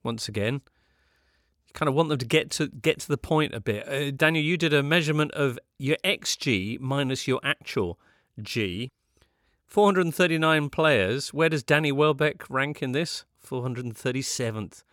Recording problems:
none

